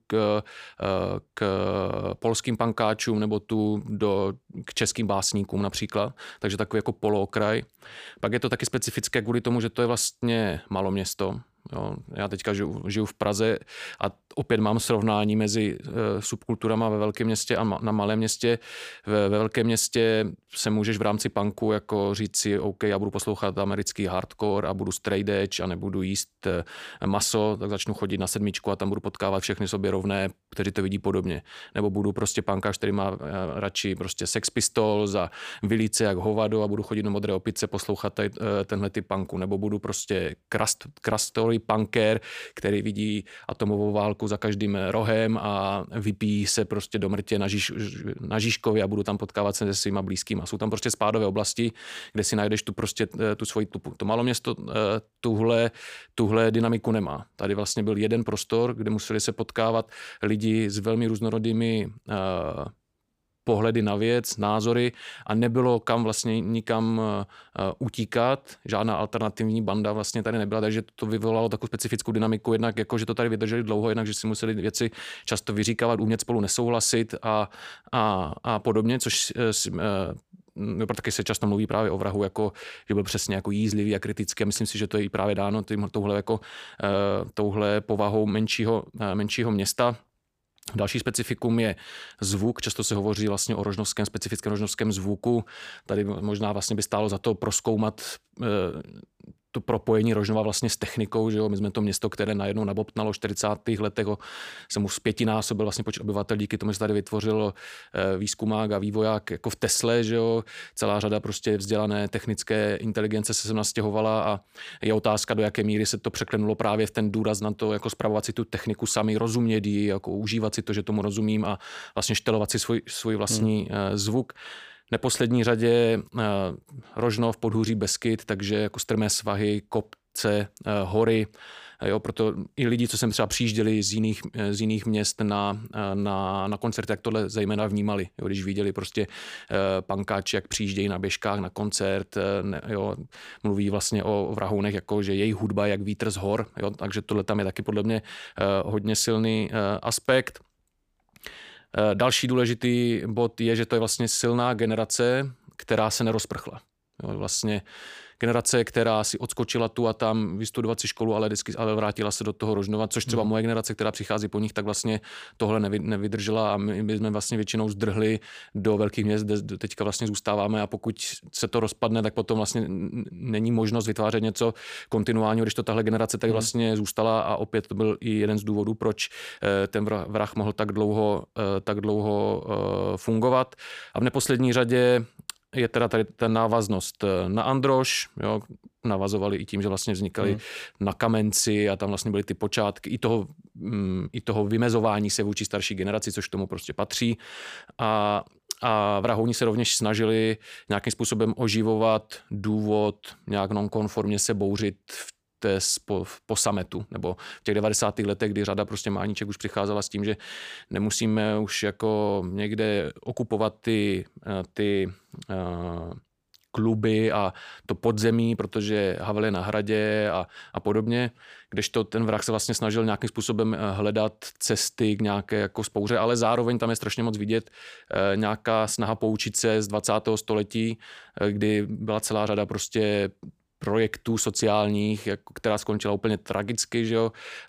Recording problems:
none

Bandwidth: 15 kHz